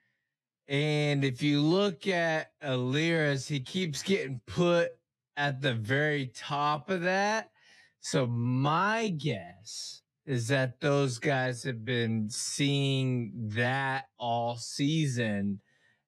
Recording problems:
wrong speed, natural pitch; too slow; 0.6 times normal speed

